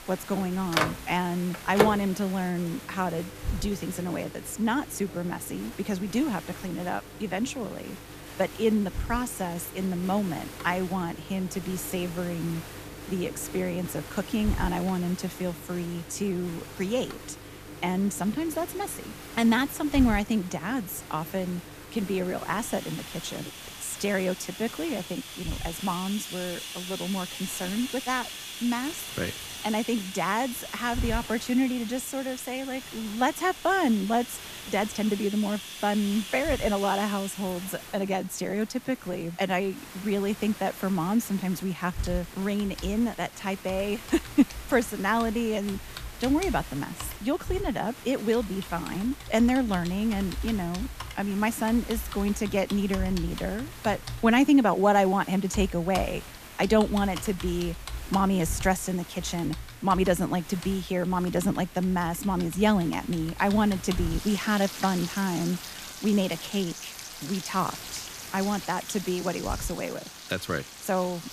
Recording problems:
household noises; noticeable; throughout; 10 dB below the speech
hiss; noticeable; throughout; 15 dB below the speech

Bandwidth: 14.5 kHz